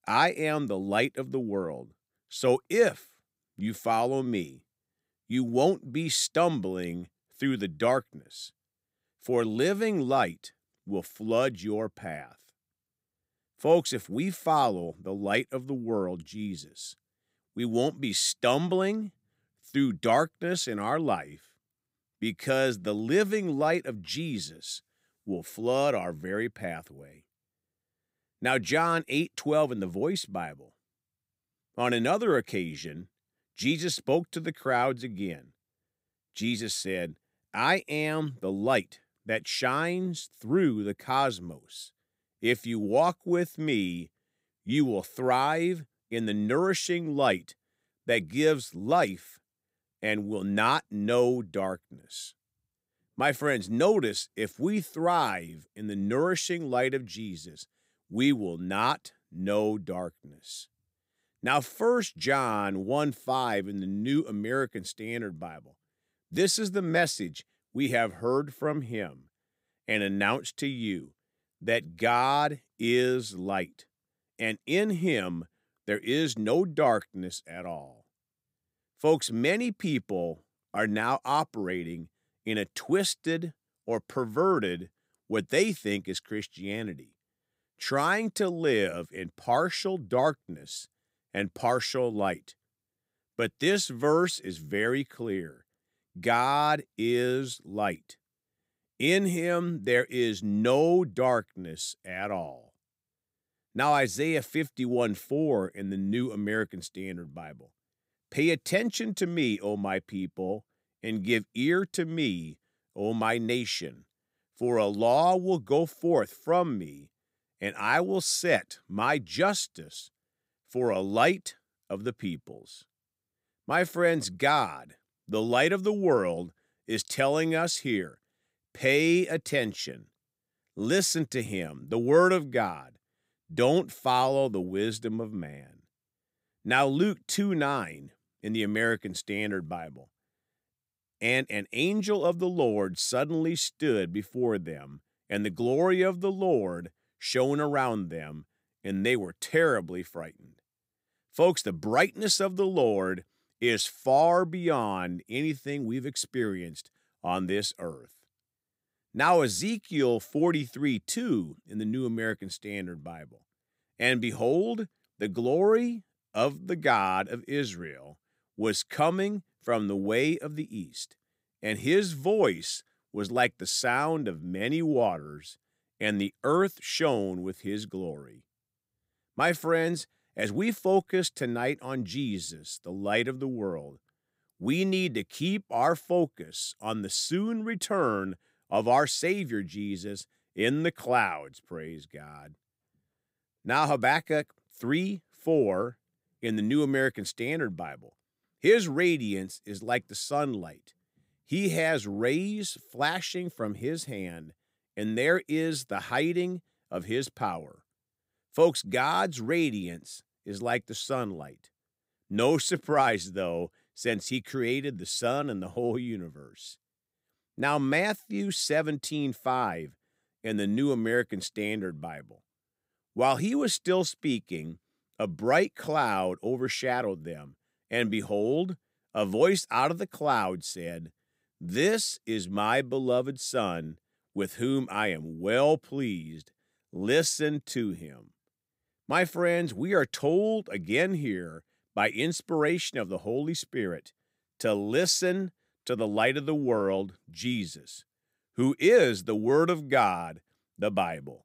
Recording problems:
none

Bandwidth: 15.5 kHz